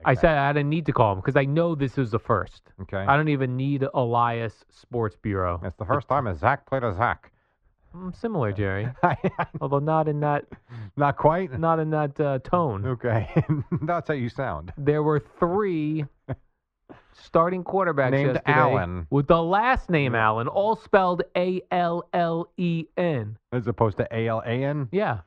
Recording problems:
muffled; very; fading above 2 kHz

